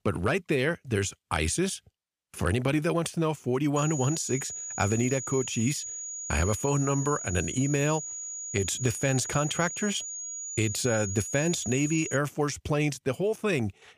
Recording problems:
high-pitched whine; loud; from 4 to 12 s; 7 kHz, 6 dB below the speech

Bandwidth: 15 kHz